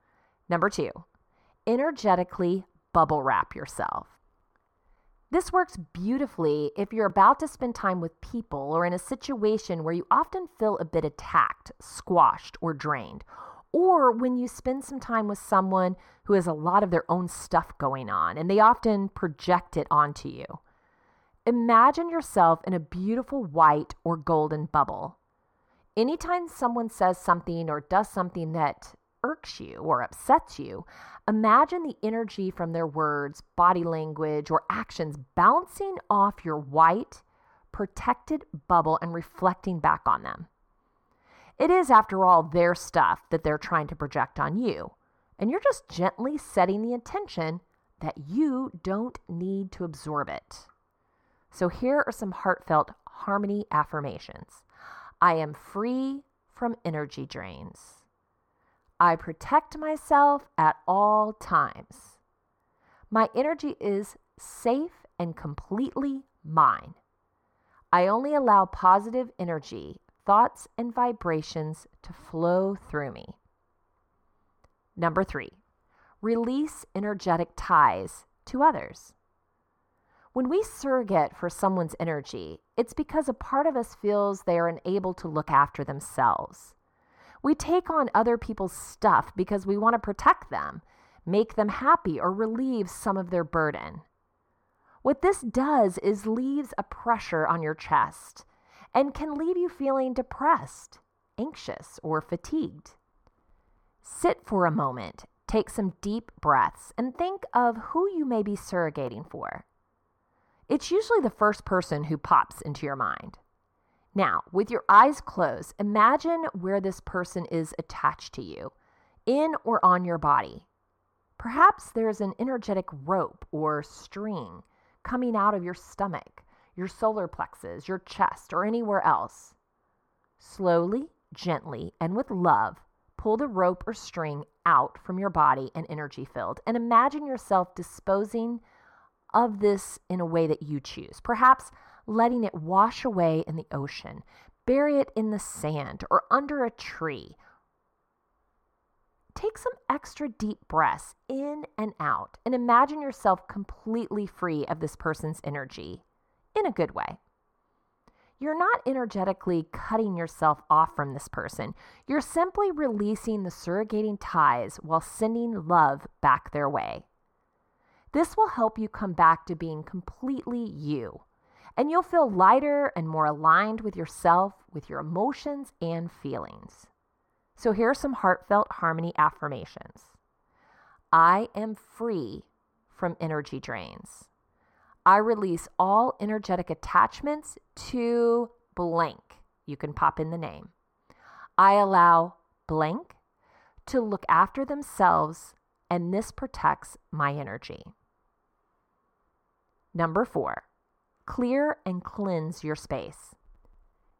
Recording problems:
muffled; slightly; fading above 2.5 kHz

